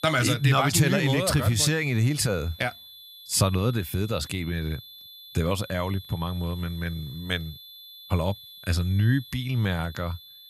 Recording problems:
high-pitched whine; noticeable; throughout; 3.5 kHz, 20 dB below the speech

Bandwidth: 15.5 kHz